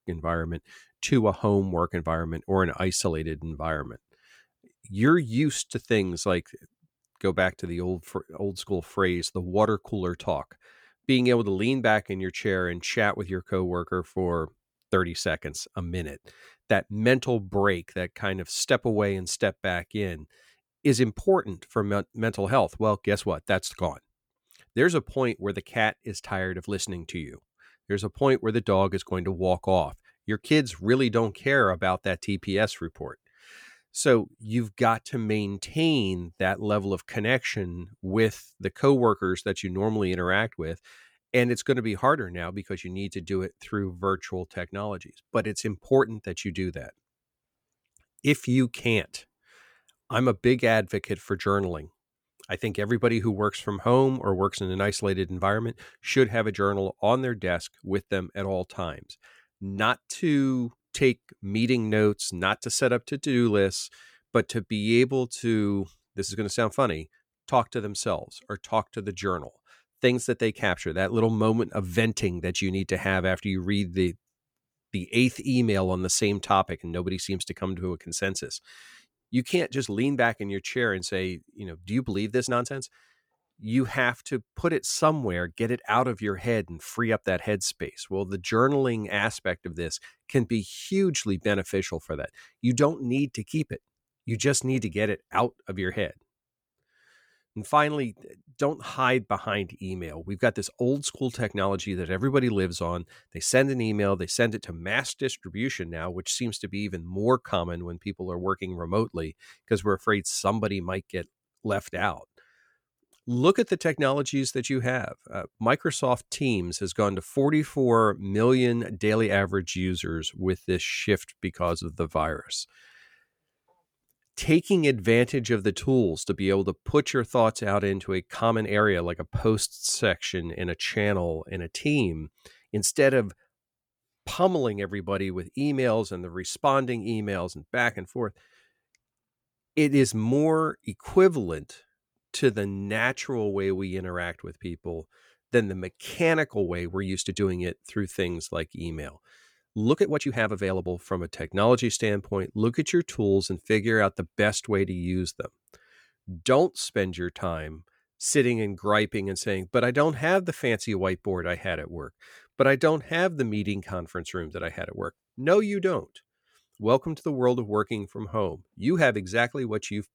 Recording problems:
uneven, jittery; strongly; from 15 s to 2:49

